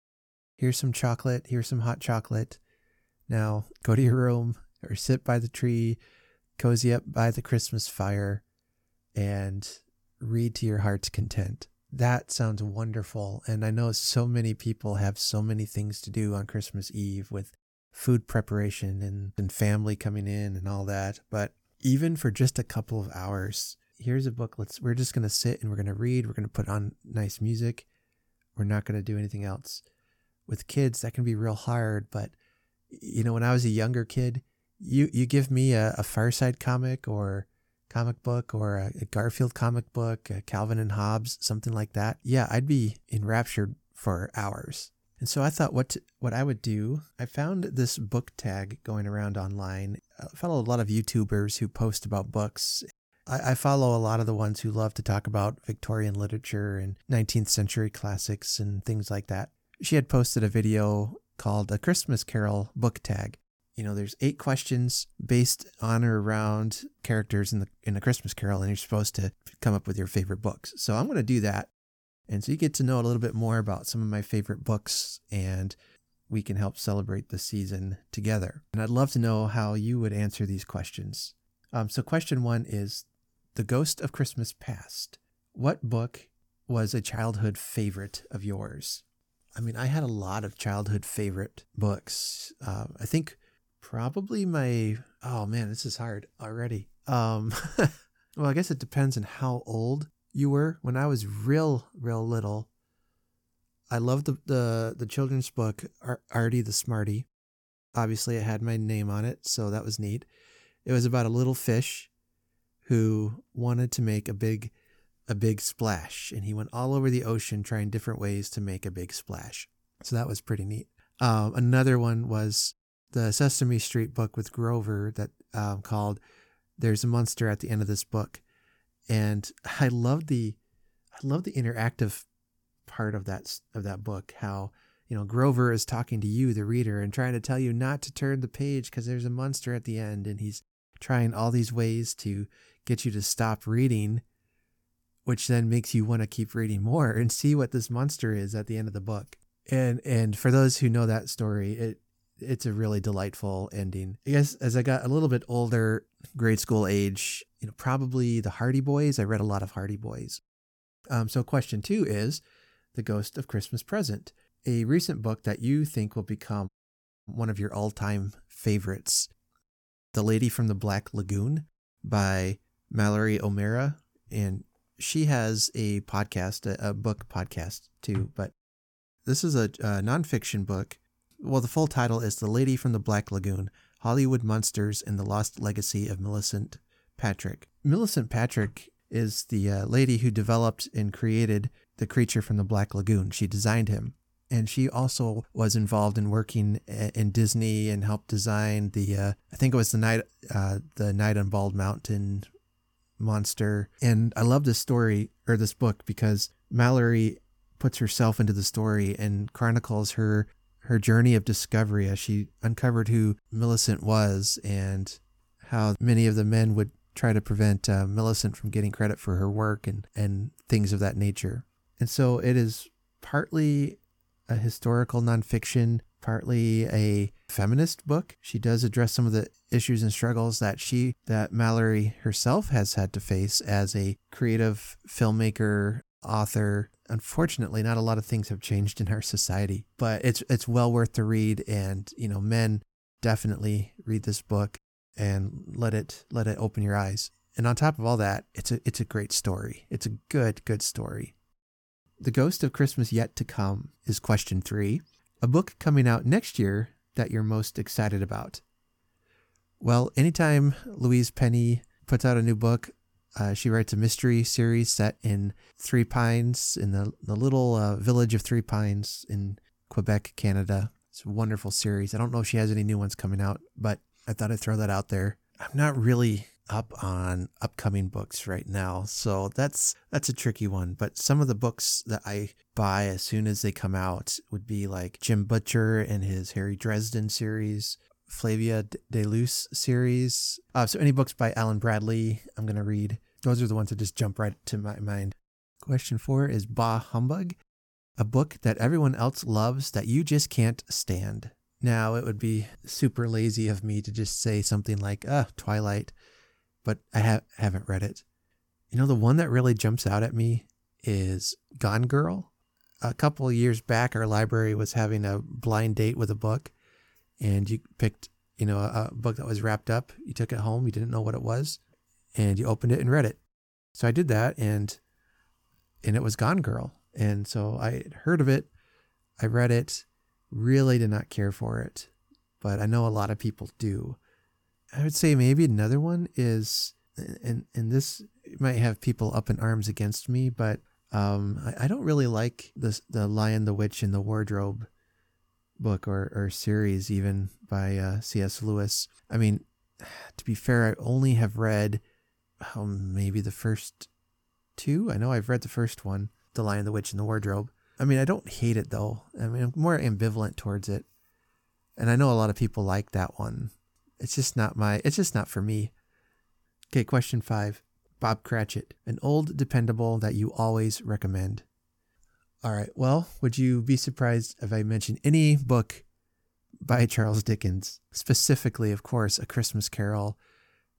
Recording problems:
audio cutting out; at 2:47 for 0.5 s

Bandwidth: 17.5 kHz